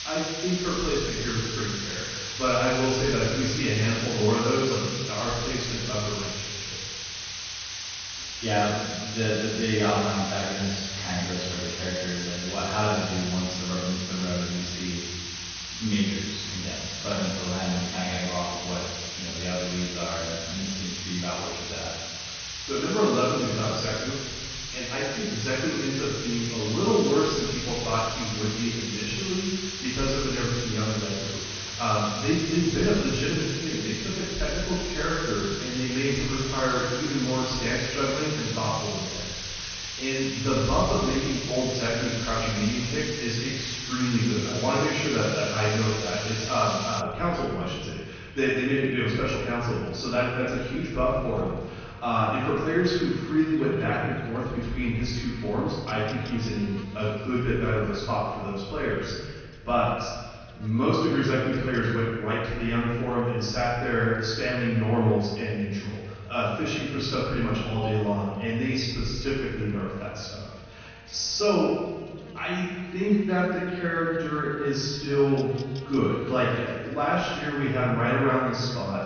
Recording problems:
room echo; strong; dies away in 1.6 s
off-mic speech; far
garbled, watery; slightly; nothing above 6.5 kHz
hiss; loud; until 47 s; 5 dB below the speech
electrical hum; faint; throughout; 60 Hz, 20 dB below the speech

